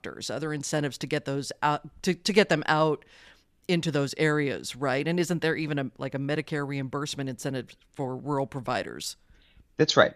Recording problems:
none

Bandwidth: 14.5 kHz